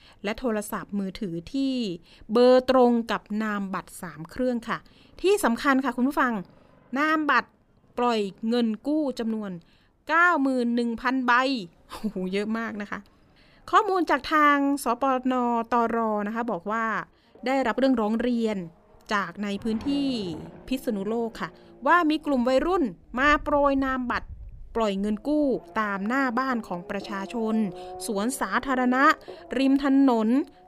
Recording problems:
traffic noise; faint; throughout; 20 dB below the speech

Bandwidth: 15 kHz